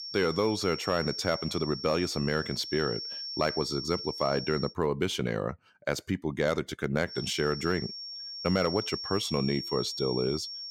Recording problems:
high-pitched whine; loud; until 4.5 s and from 7 s on; 5.5 kHz, 6 dB below the speech

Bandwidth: 16.5 kHz